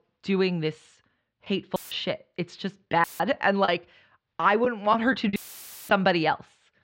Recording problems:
muffled; slightly; fading above 4 kHz
choppy; occasionally; 4% of the speech affected
audio cutting out; filled with static; at 2 s, at 3 s and at 5.5 s for 0.5 s

